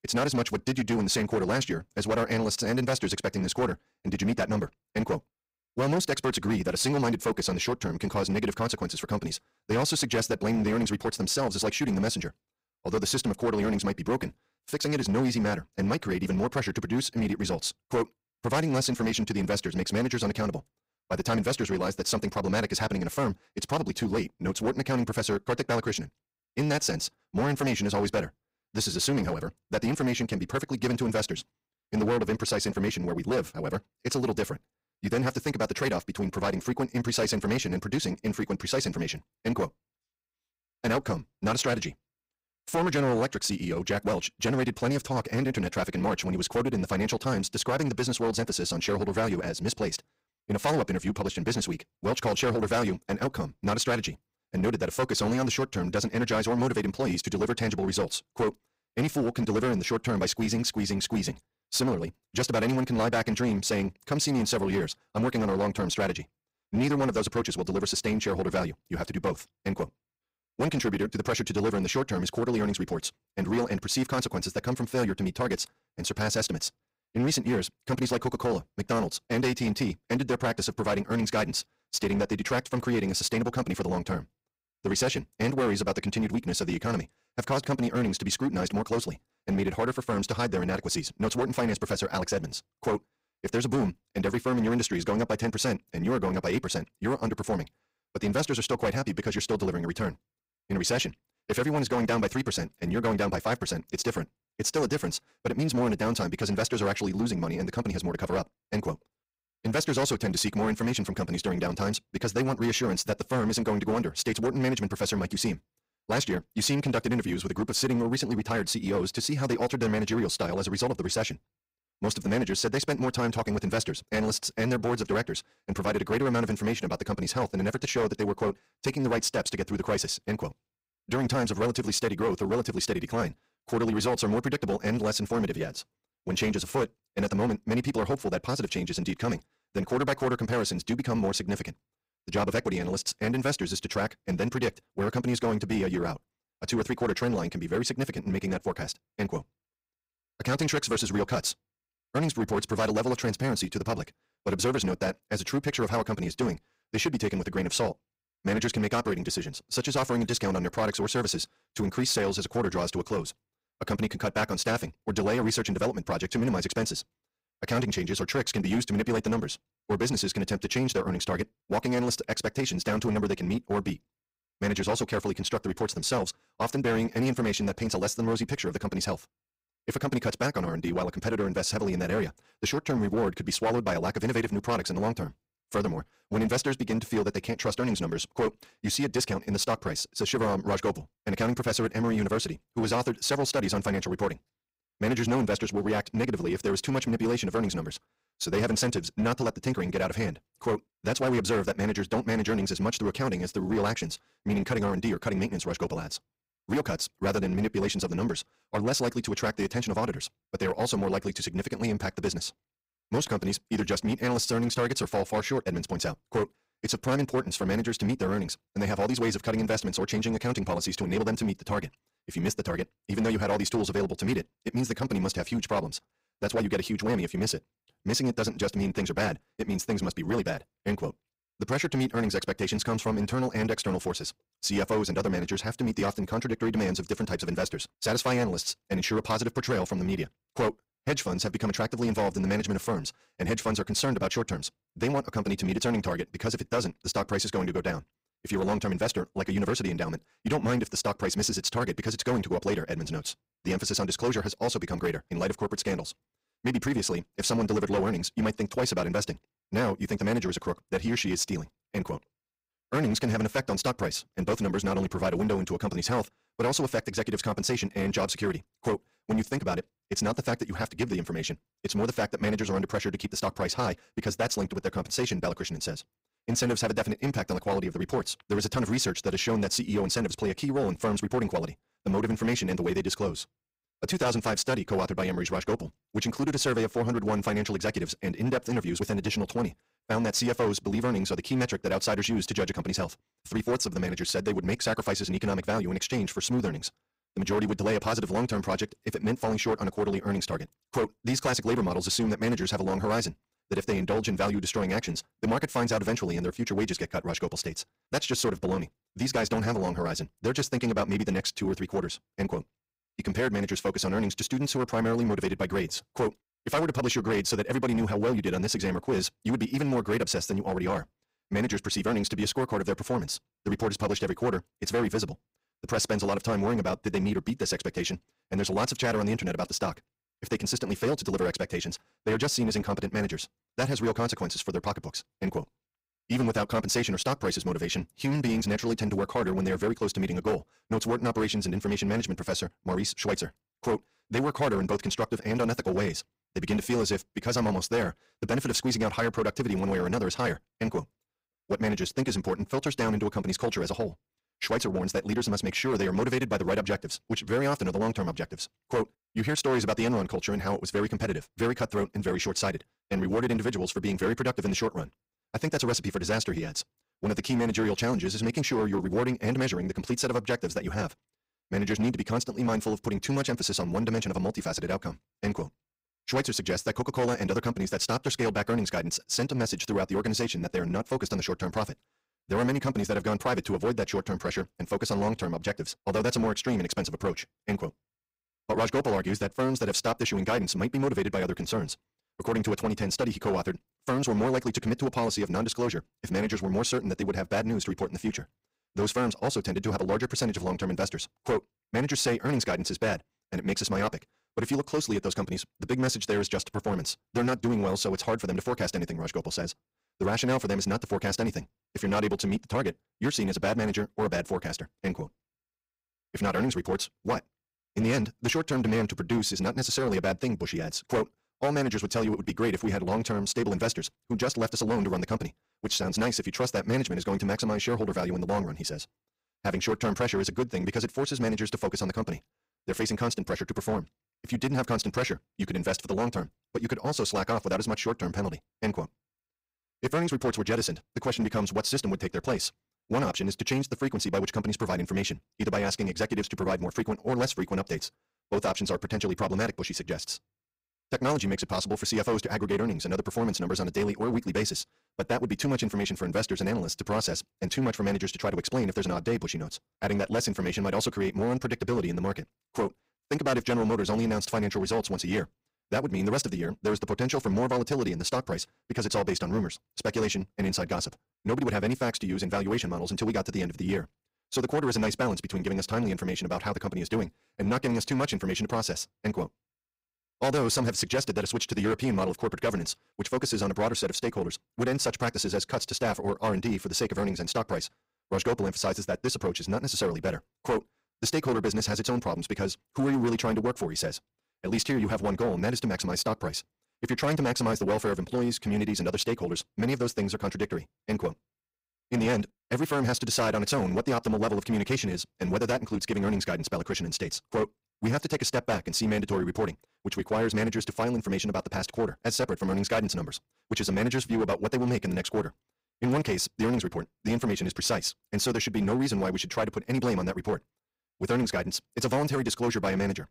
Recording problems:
wrong speed, natural pitch; too fast; 1.7 times normal speed
distortion; slight; 8% of the sound clipped

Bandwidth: 15.5 kHz